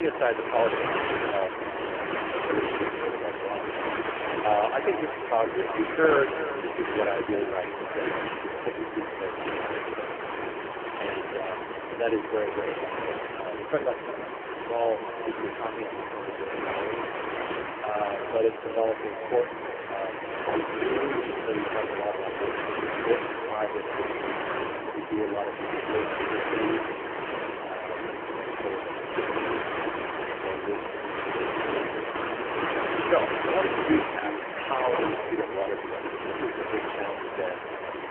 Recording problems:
phone-call audio; poor line
echo of what is said; noticeable; throughout; 350 ms later, 15 dB below the speech
wind noise on the microphone; heavy; 2 dB below the speech
hiss; loud; throughout; 5 dB below the speech
abrupt cut into speech; at the start

